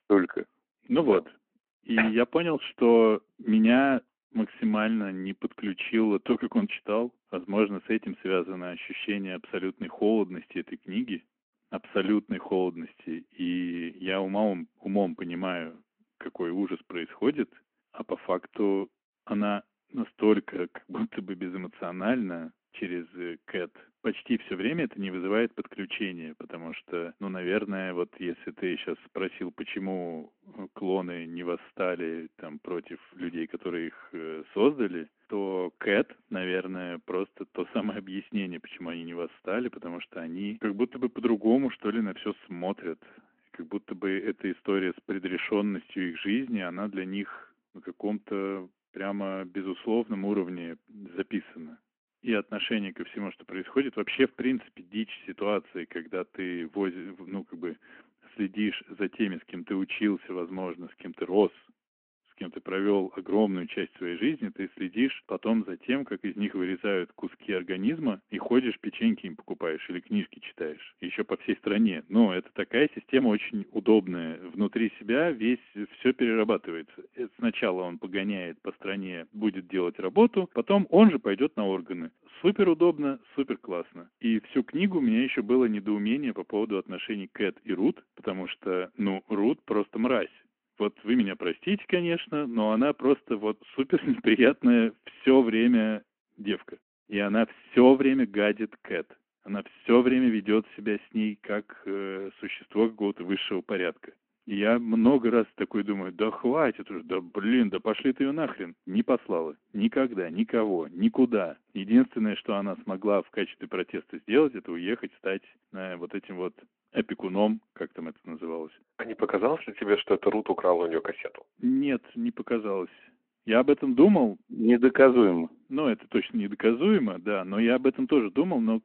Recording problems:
phone-call audio

